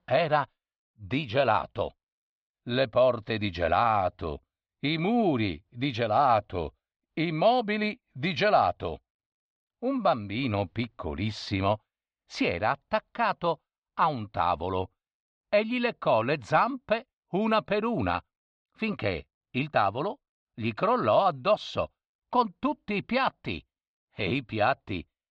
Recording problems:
muffled; slightly; fading above 4 kHz

